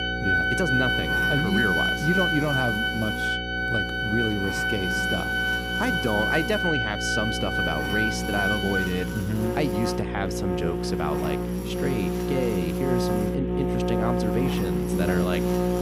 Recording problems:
background music; very loud; throughout; 3 dB above the speech
electrical hum; loud; throughout; 60 Hz, 6 dB below the speech

